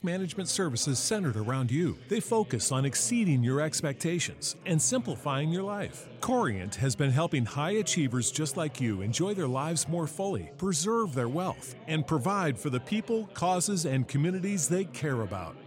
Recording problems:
chatter from many people; noticeable; throughout; 20 dB below the speech

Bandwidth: 16 kHz